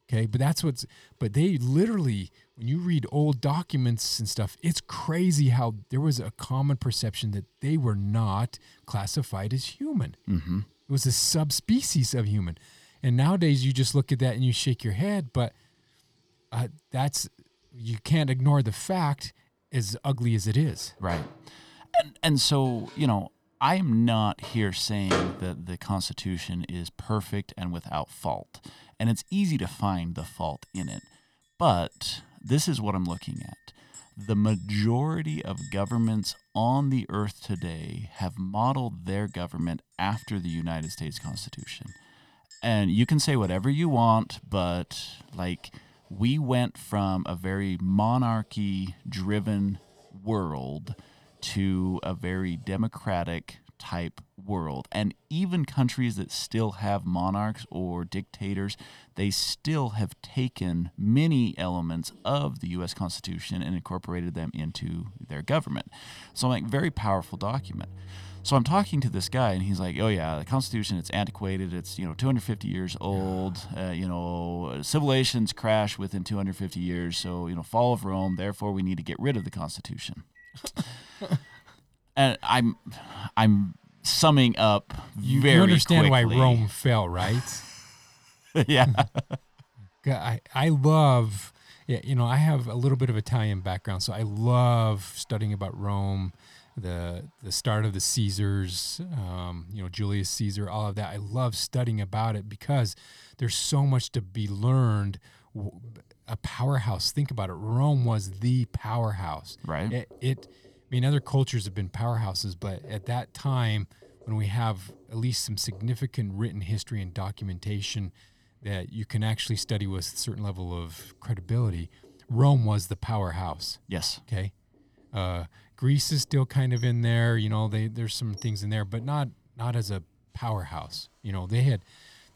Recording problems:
household noises; noticeable; throughout; 20 dB below the speech

